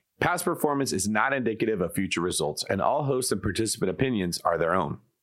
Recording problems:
squashed, flat; heavily

